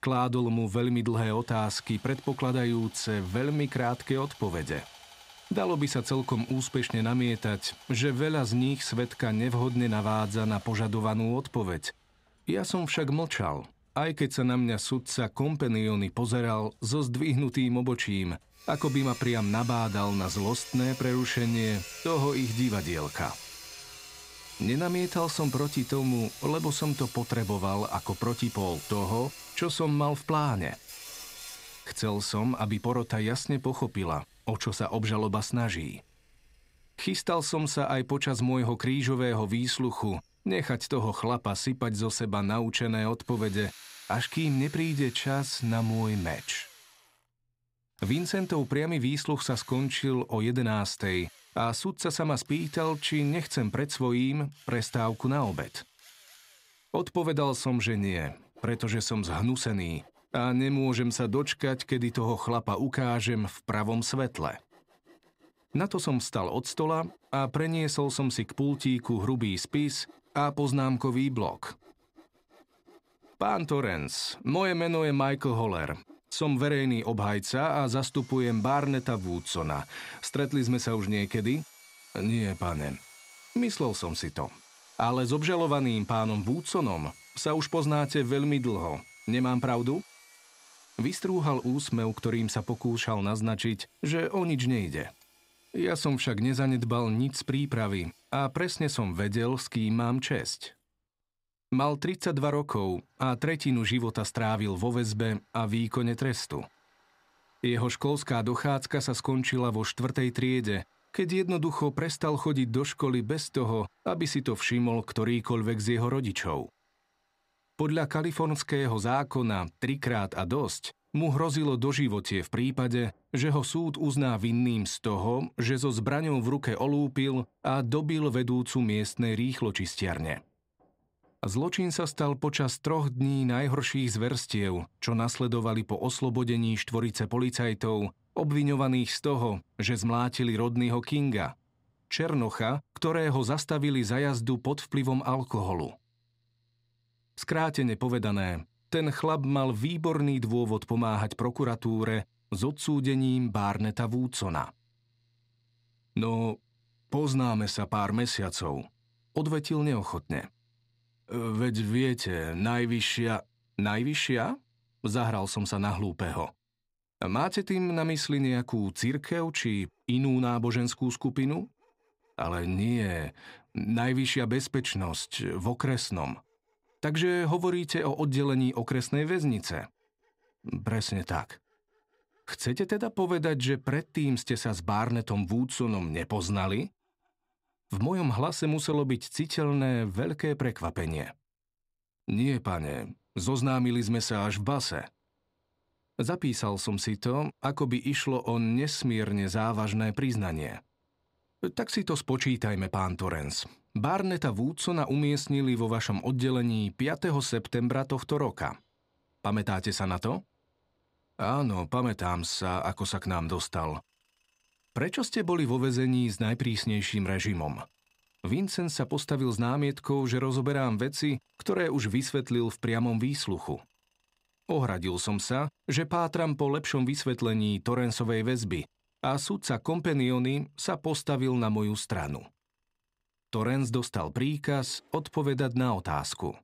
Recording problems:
machinery noise; noticeable; throughout; 20 dB below the speech

